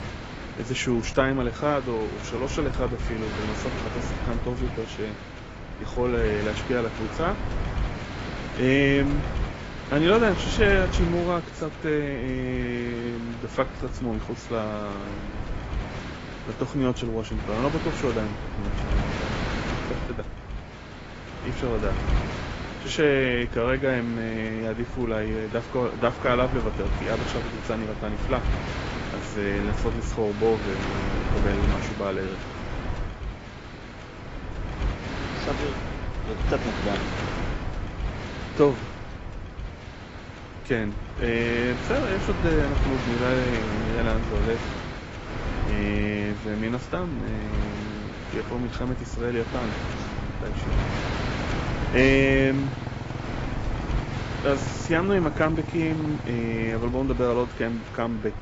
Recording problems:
garbled, watery; badly; nothing above 7.5 kHz
wind noise on the microphone; heavy; 7 dB below the speech
traffic noise; noticeable; throughout; 15 dB below the speech

